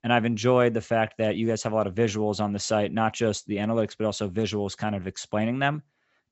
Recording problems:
high frequencies cut off; noticeable; nothing above 7.5 kHz

